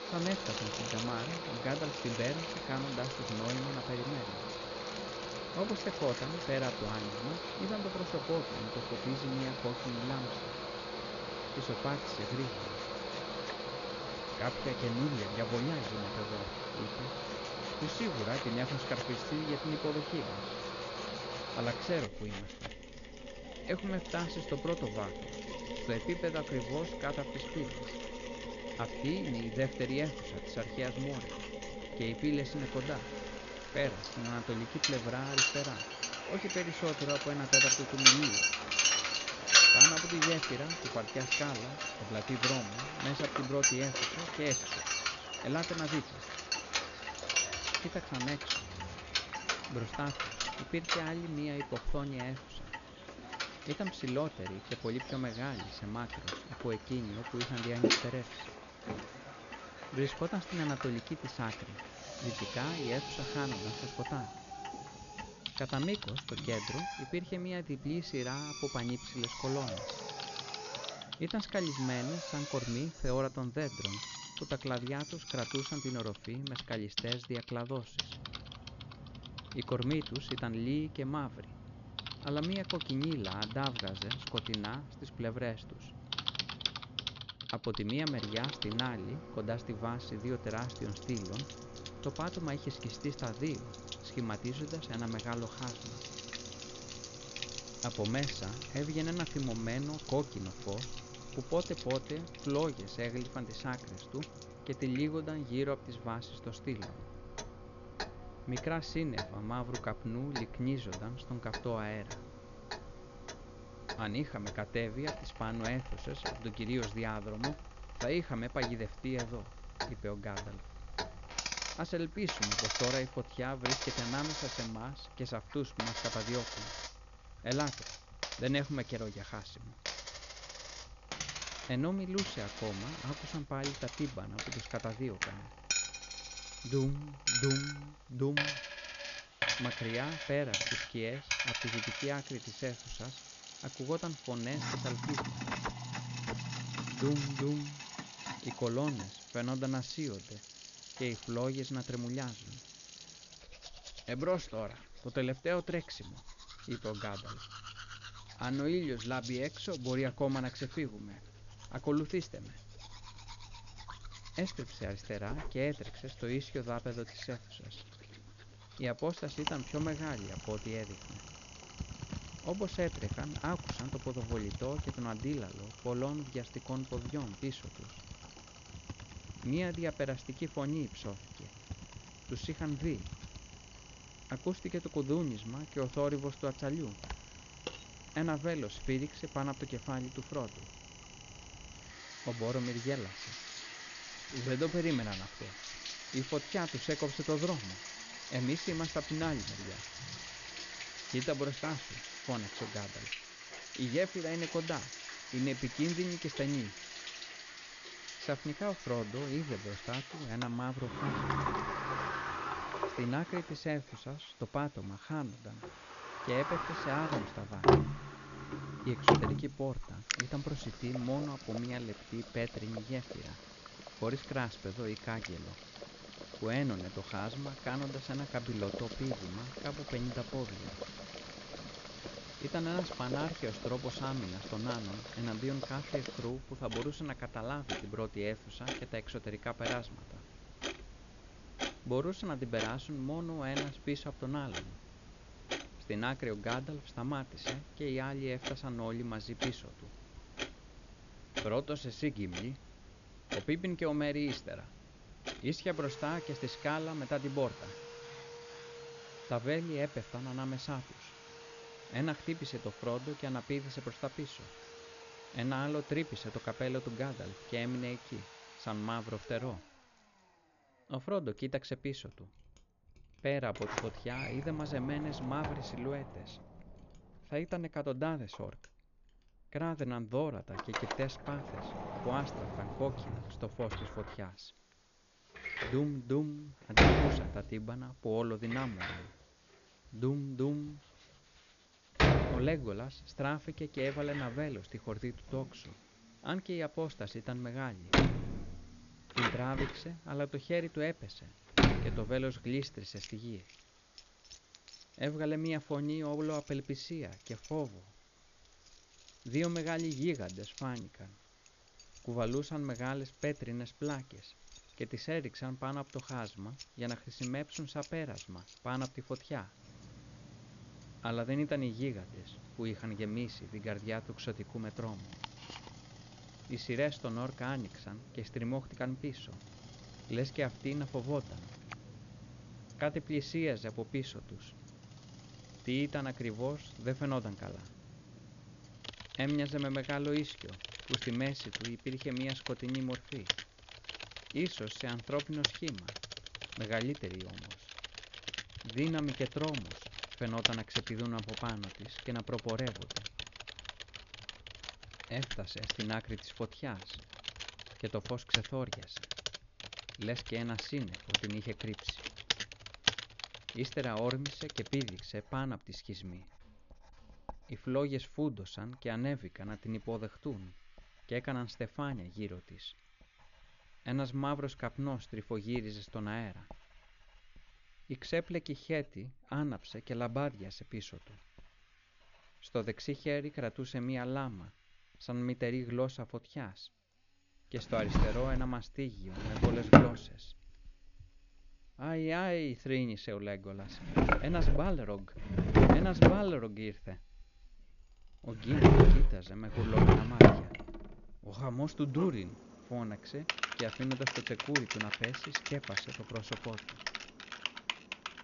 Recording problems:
high frequencies cut off; noticeable; nothing above 7 kHz
machinery noise; very loud; throughout; 2 dB above the speech
household noises; loud; throughout; as loud as the speech
hiss; faint; until 1:16, from 1:51 to 3:54 and from 4:44 to 5:47; 25 dB below the speech
crackling; faint; at 4:06; 30 dB below the speech

